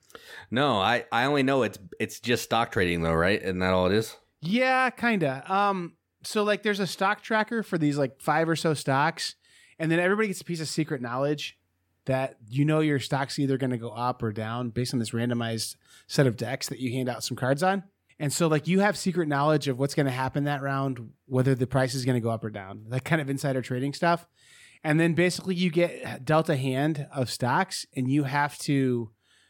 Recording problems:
none

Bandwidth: 17 kHz